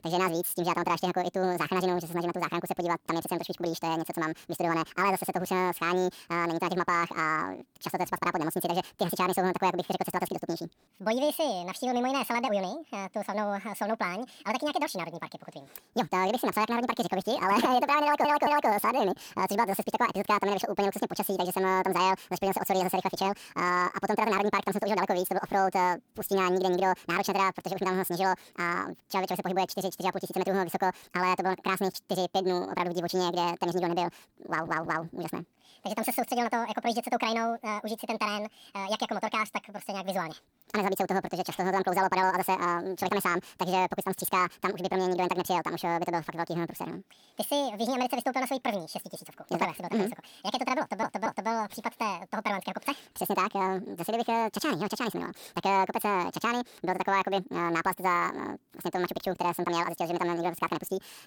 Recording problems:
wrong speed and pitch; too fast and too high; 1.7 times normal speed
audio stuttering; at 18 s, at 34 s and at 51 s

